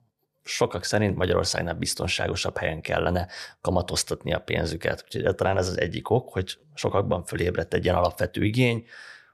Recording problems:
none

